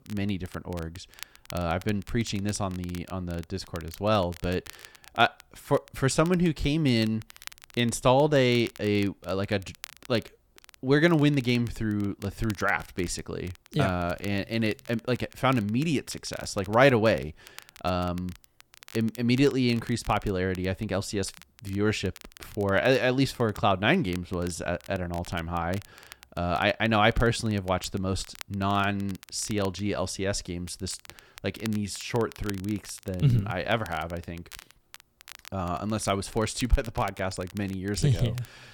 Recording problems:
crackle, like an old record; faint; 20 dB below the speech

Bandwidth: 18 kHz